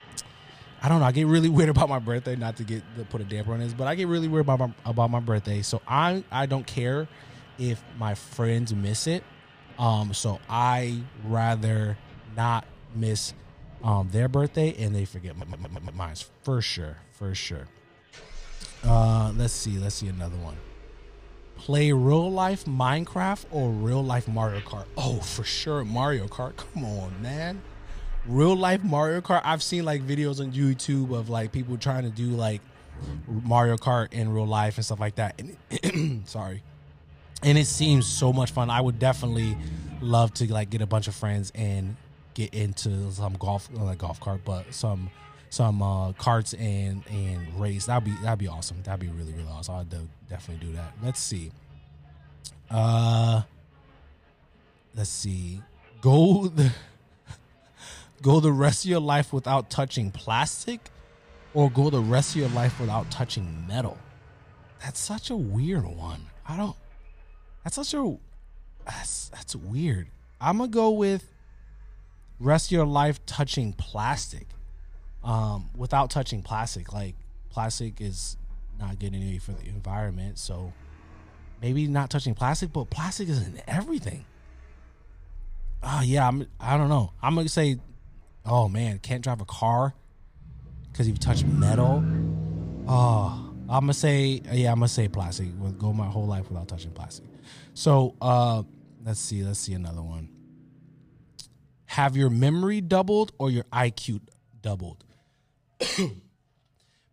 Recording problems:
traffic noise; noticeable; throughout; 15 dB below the speech
crowd noise; faint; throughout; 30 dB below the speech
audio stuttering; at 15 s

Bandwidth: 15 kHz